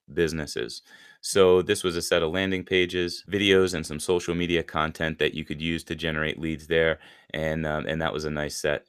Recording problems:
none

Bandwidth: 14.5 kHz